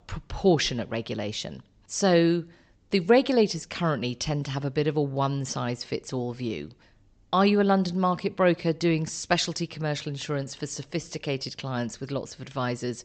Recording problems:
high frequencies cut off; noticeable; nothing above 8 kHz

